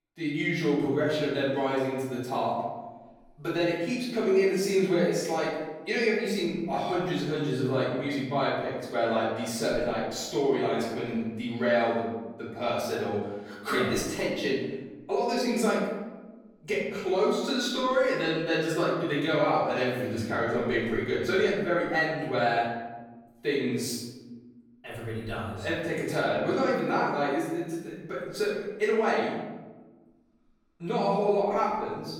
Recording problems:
off-mic speech; far
room echo; noticeable; dies away in 1.1 s

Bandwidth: 18 kHz